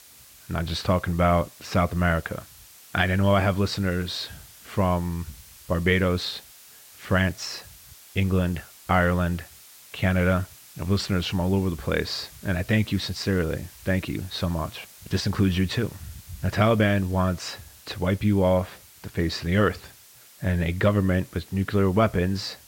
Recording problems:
muffled; slightly; fading above 2.5 kHz
hiss; faint; throughout; 20 dB below the speech

